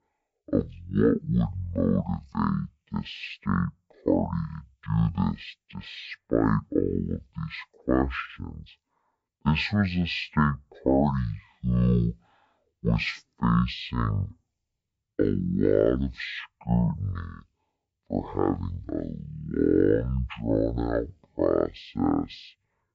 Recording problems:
wrong speed and pitch; too slow and too low; 0.5 times normal speed

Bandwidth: 7.5 kHz